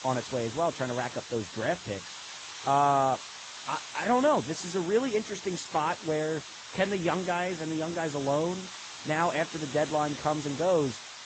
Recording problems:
garbled, watery; slightly; nothing above 8 kHz
hiss; noticeable; throughout; 10 dB below the speech

